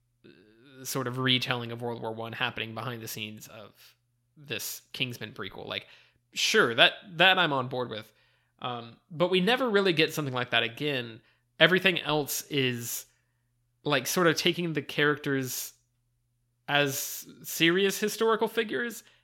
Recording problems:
none

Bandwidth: 16.5 kHz